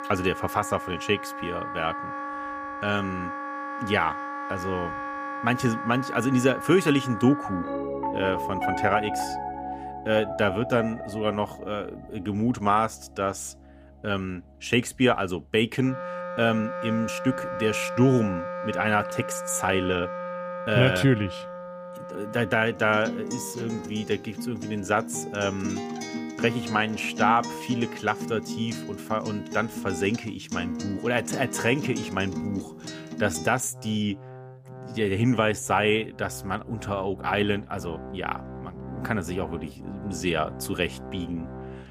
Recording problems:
background music; loud; throughout; 8 dB below the speech

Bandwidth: 15 kHz